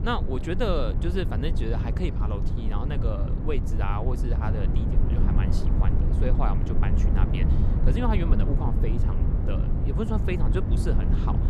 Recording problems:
low rumble; loud; throughout; 4 dB below the speech

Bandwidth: 15 kHz